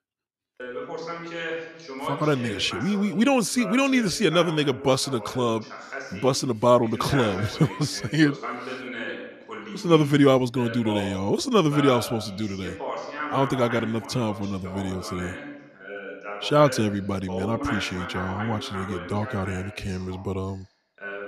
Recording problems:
voice in the background; noticeable; throughout; 10 dB below the speech

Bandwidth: 14 kHz